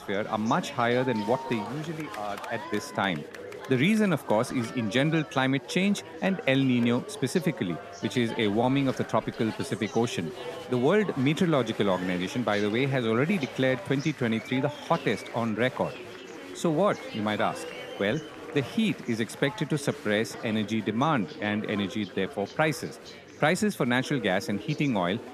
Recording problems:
chatter from many people; noticeable; throughout; 15 dB below the speech

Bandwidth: 14.5 kHz